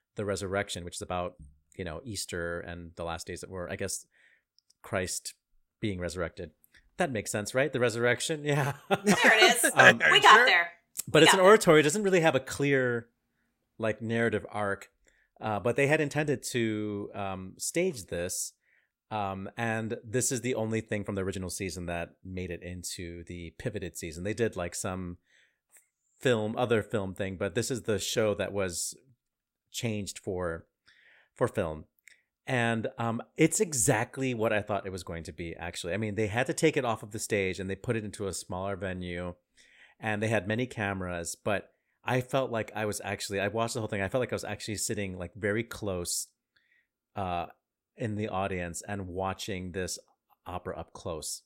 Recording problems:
uneven, jittery; strongly; from 0.5 to 50 s

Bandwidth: 16 kHz